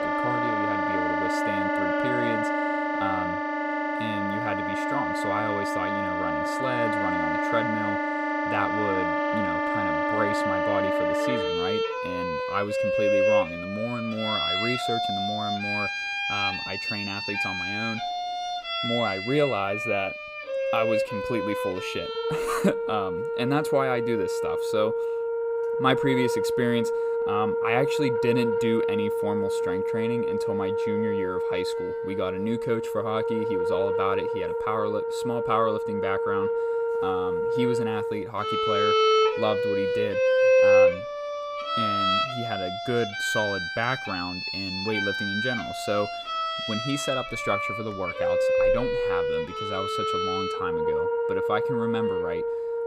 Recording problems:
background music; very loud; throughout; 4 dB above the speech

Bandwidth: 15.5 kHz